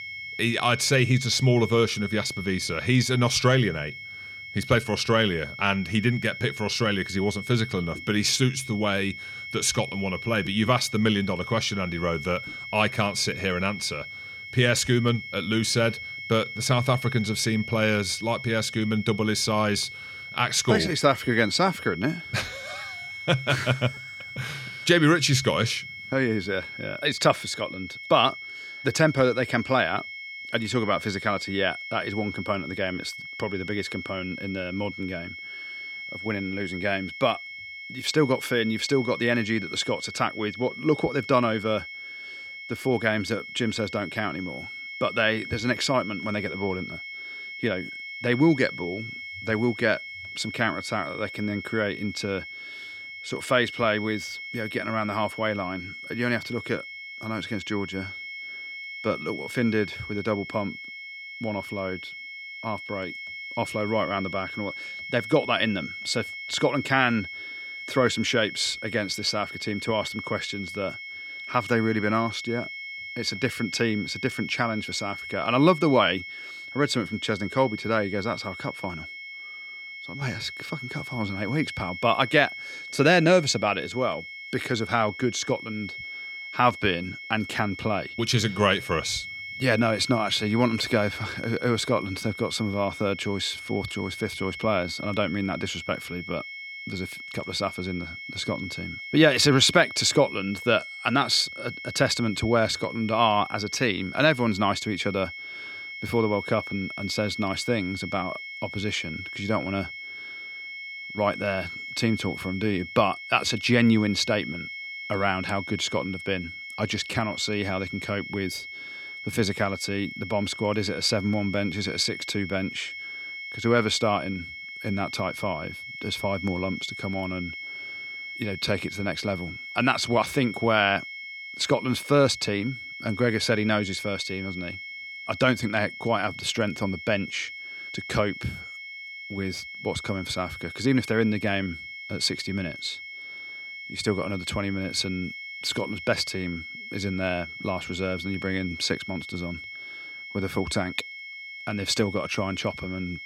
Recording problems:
high-pitched whine; loud; throughout; 2 kHz, 10 dB below the speech

